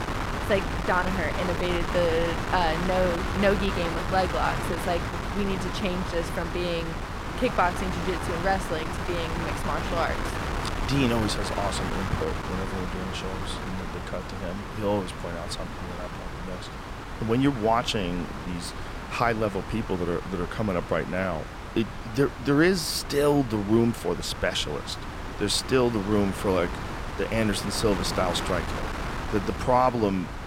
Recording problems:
wind noise on the microphone; heavy; 5 dB below the speech

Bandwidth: 16 kHz